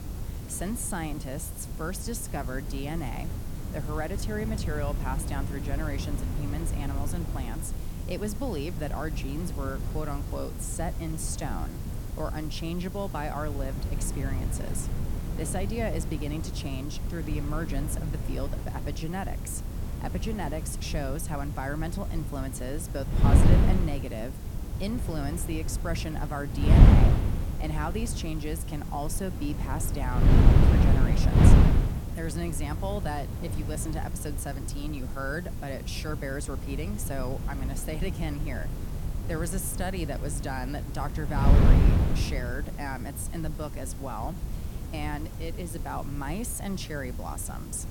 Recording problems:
wind noise on the microphone; heavy; 3 dB below the speech
hiss; noticeable; throughout; 15 dB below the speech

